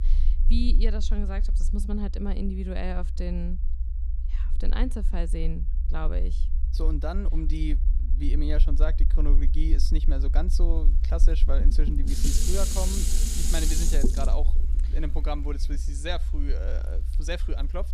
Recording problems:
low rumble; noticeable; throughout; 15 dB below the speech
clattering dishes; loud; from 12 to 14 s; peak 5 dB above the speech

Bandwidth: 14.5 kHz